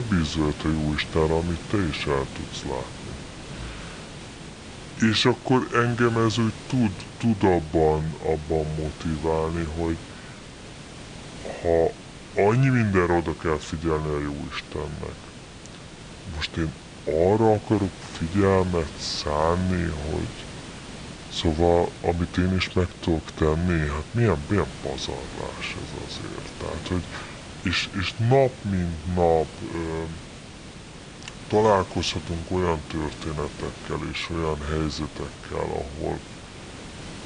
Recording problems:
wrong speed and pitch; too slow and too low; 0.7 times normal speed
hiss; noticeable; throughout; 15 dB below the speech
abrupt cut into speech; at the start

